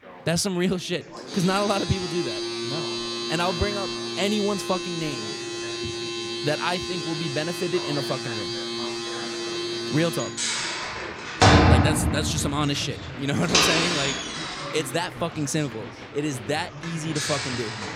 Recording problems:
household noises; very loud; throughout; 2 dB above the speech
chatter from many people; noticeable; throughout; 10 dB below the speech

